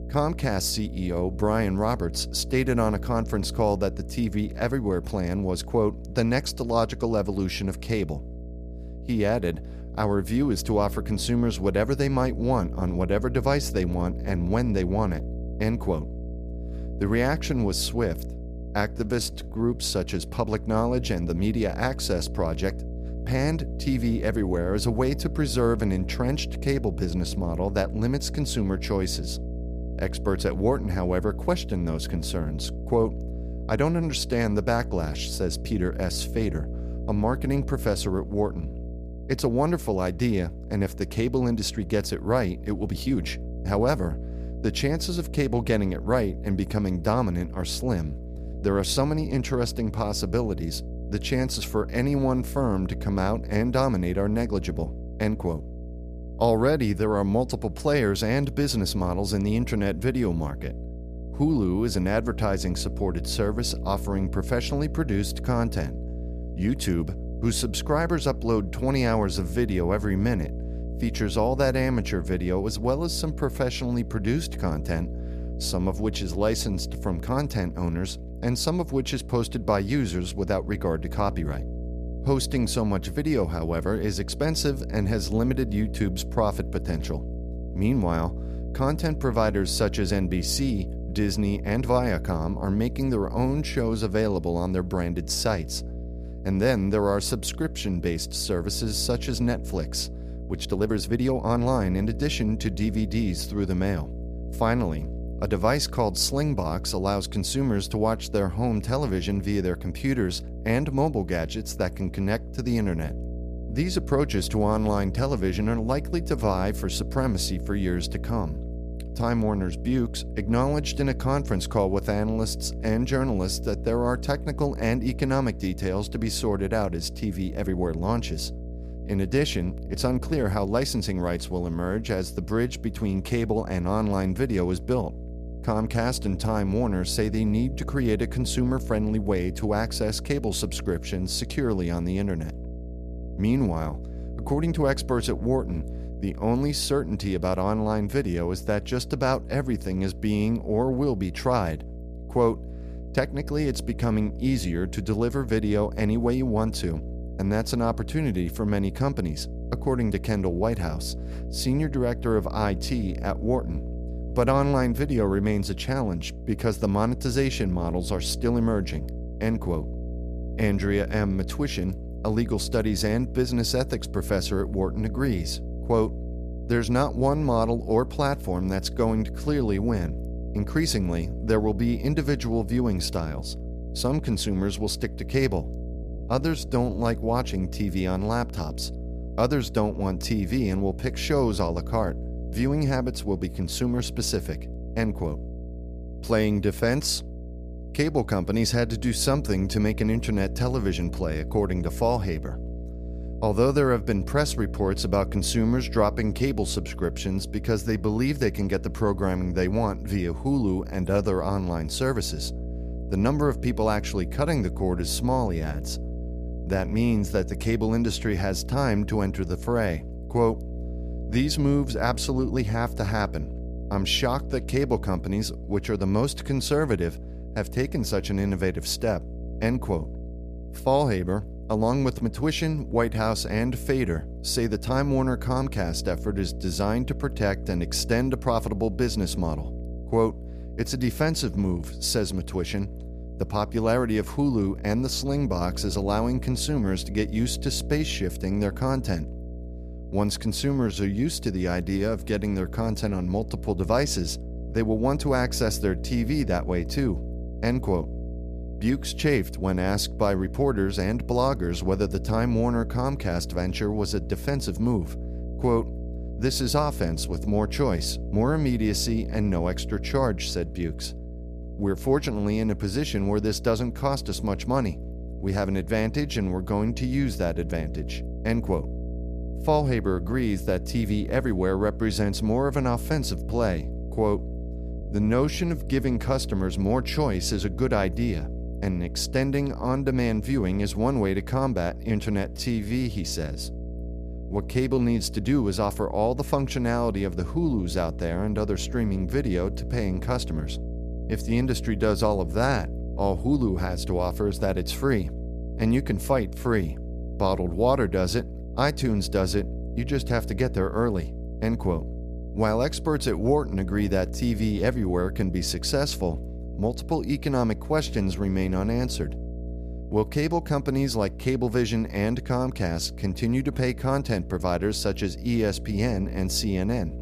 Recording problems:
electrical hum; noticeable; throughout; 60 Hz, 15 dB below the speech
uneven, jittery; strongly; from 19 s to 4:53

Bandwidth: 14.5 kHz